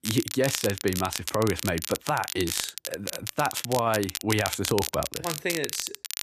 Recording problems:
crackle, like an old record; loud; 4 dB below the speech

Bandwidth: 14.5 kHz